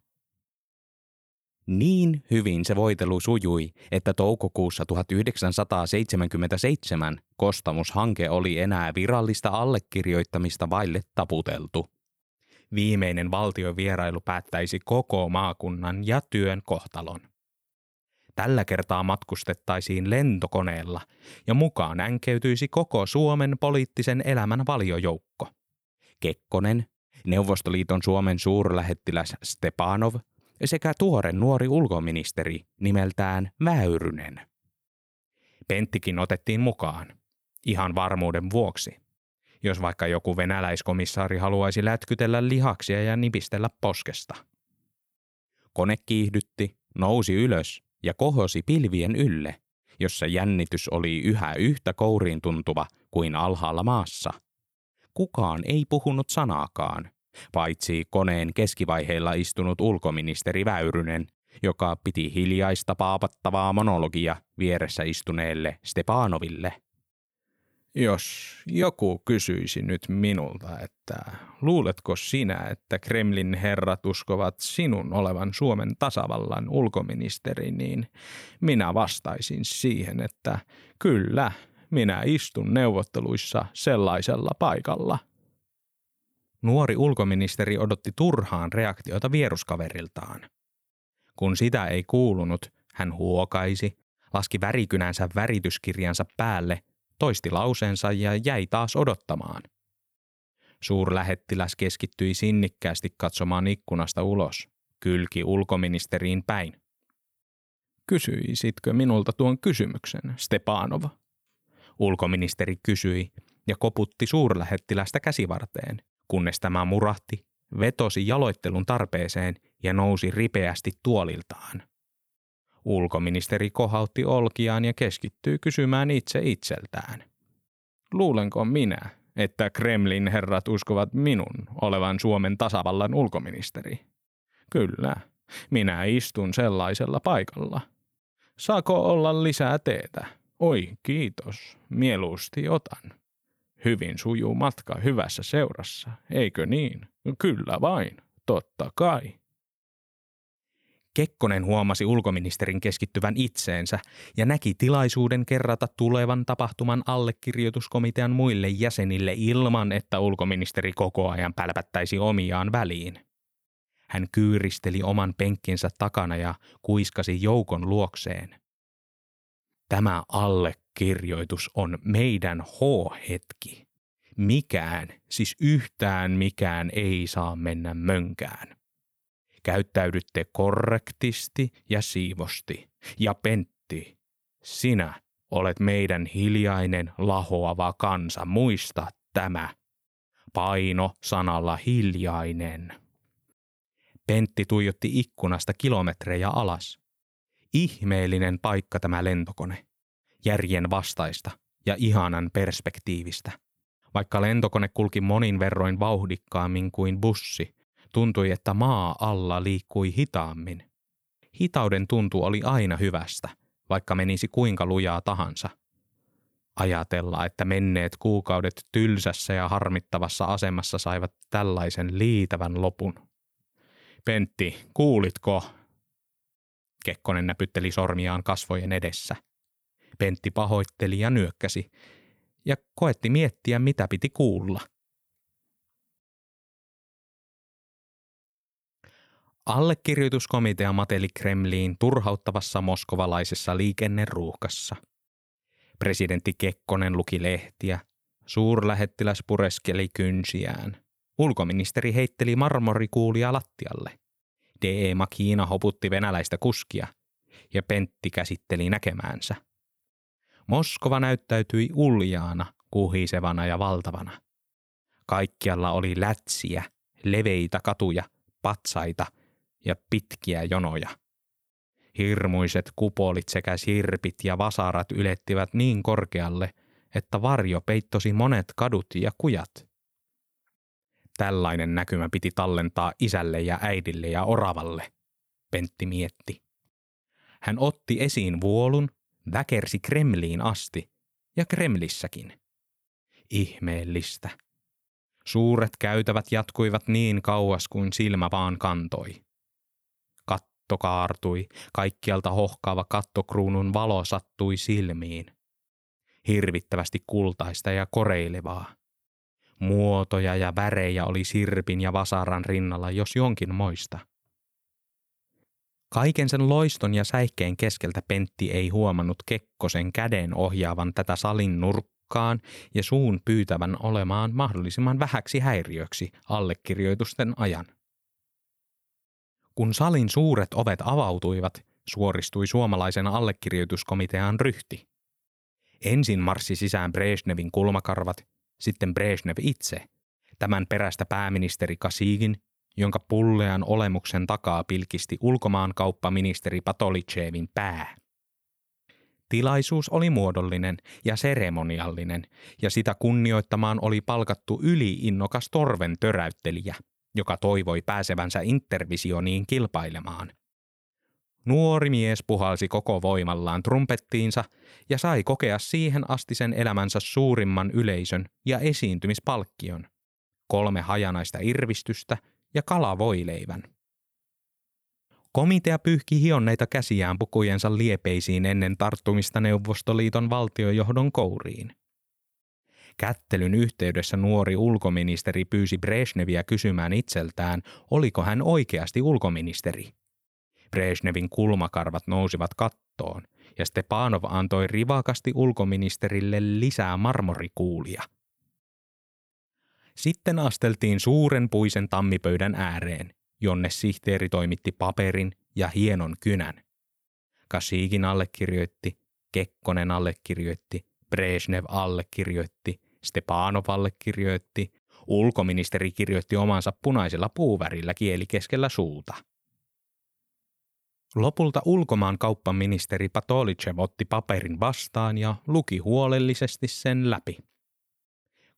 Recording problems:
none

